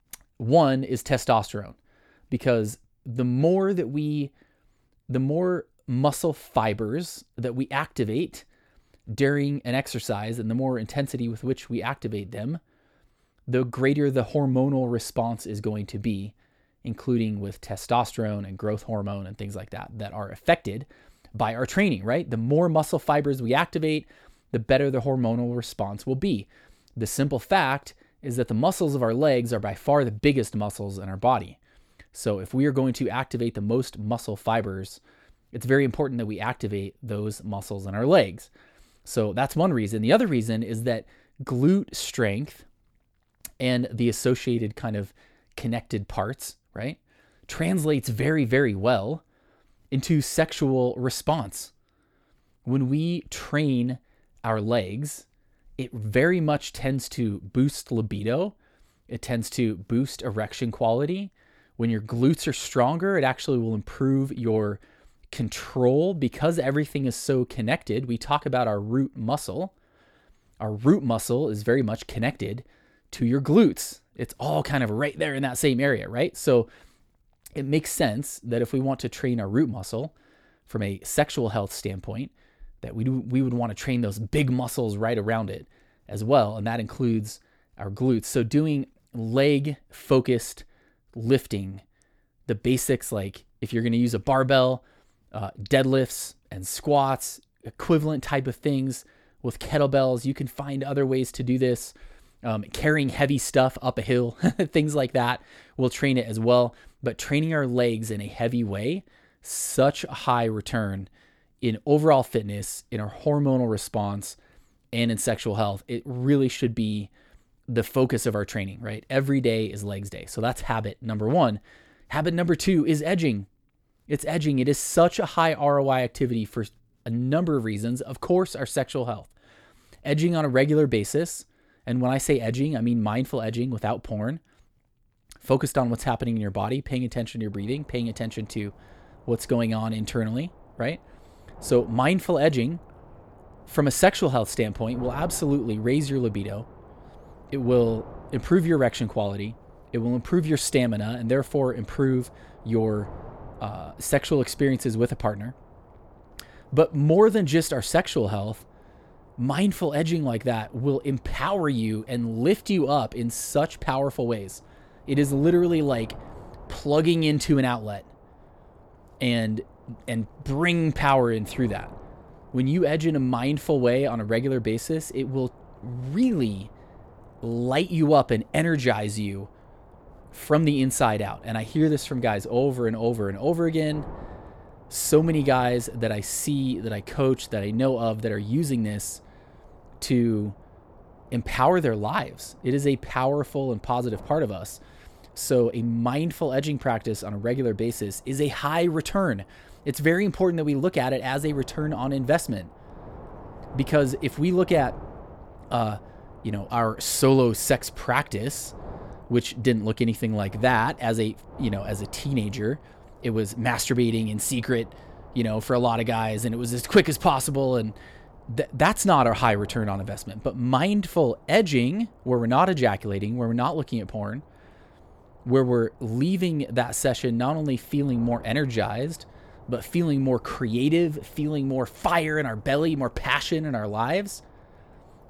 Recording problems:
wind noise on the microphone; occasional gusts; from 2:18 on; 25 dB below the speech

